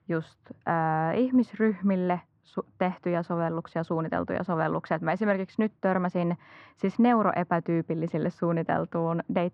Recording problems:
muffled; very; fading above 1 kHz

